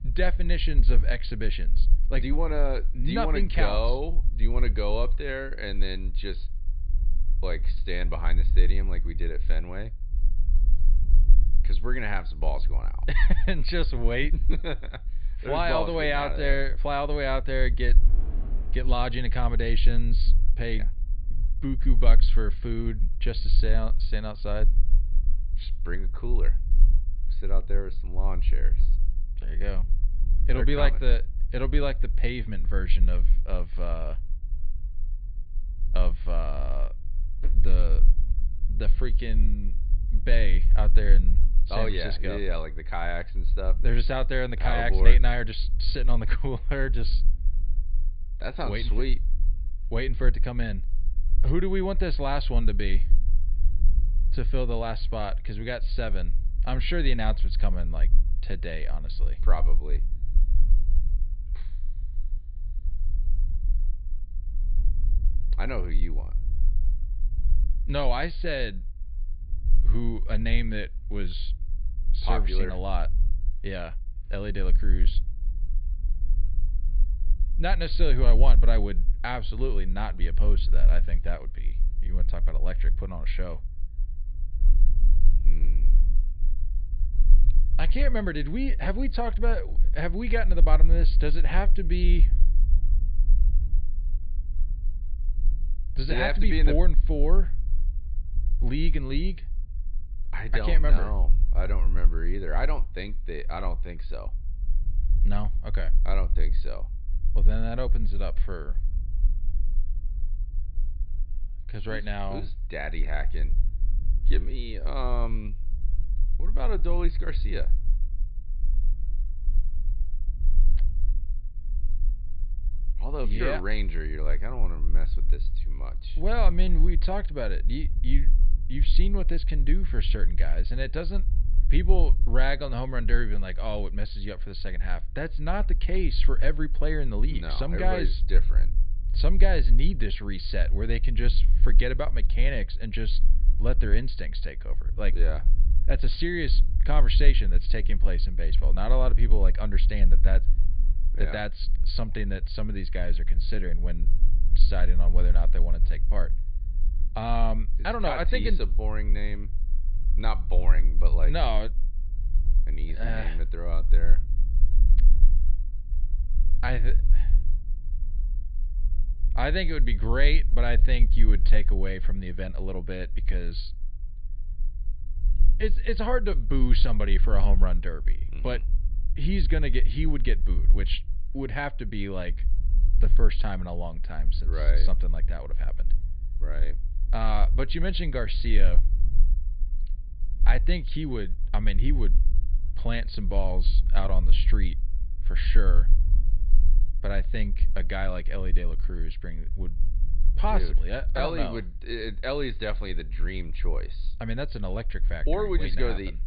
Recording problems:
high frequencies cut off; severe; nothing above 4.5 kHz
low rumble; noticeable; throughout; 20 dB below the speech
rain or running water; faint; throughout; 25 dB below the speech

